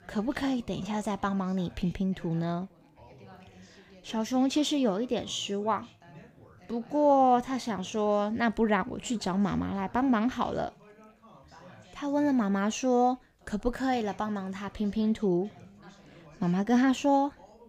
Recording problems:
background chatter; faint; throughout; 3 voices, 25 dB below the speech

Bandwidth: 15.5 kHz